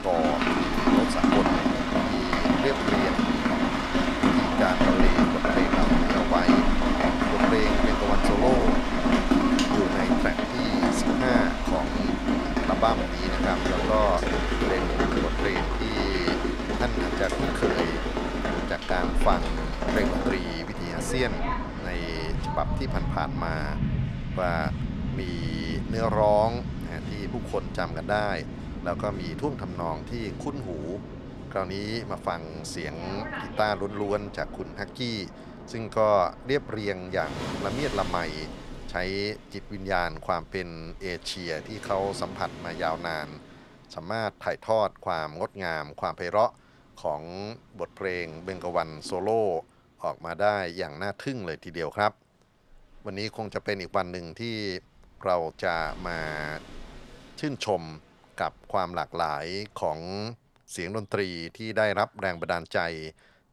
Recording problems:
rain or running water; very loud; throughout; 4 dB above the speech

